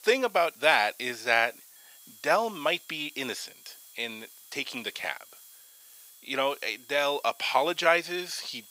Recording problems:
thin; very; fading below 600 Hz
high-pitched whine; faint; from 2 s on; 3.5 kHz, 30 dB below the speech
hiss; faint; throughout; 20 dB below the speech

